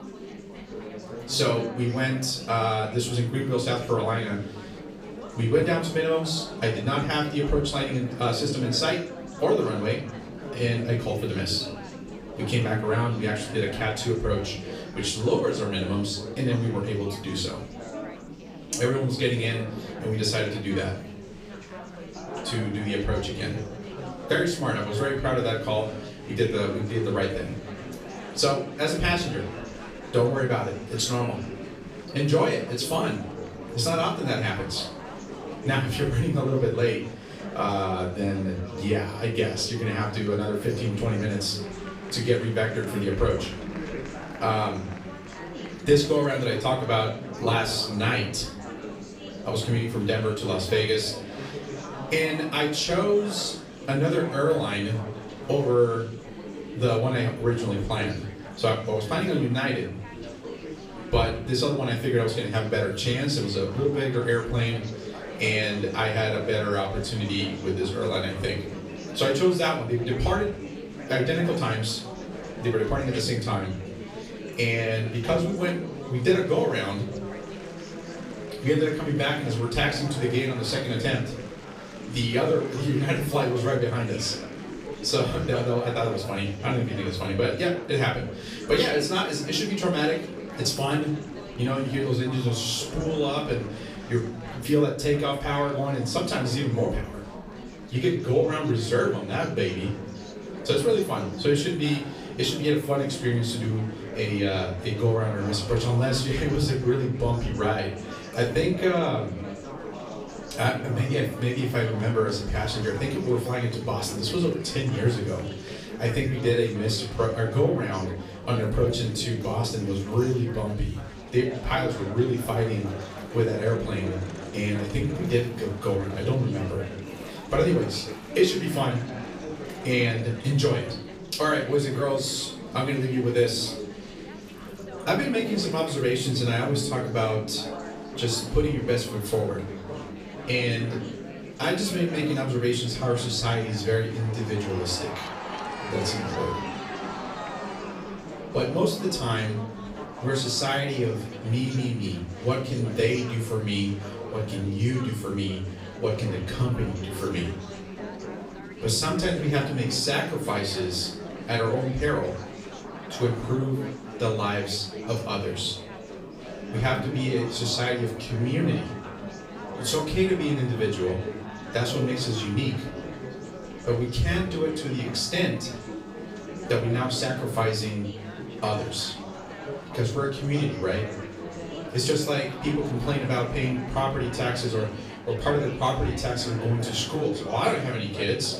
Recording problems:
off-mic speech; far
room echo; slight; dies away in 0.4 s
chatter from many people; noticeable; throughout; 10 dB below the speech
background music; faint; throughout; 20 dB below the speech

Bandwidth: 15.5 kHz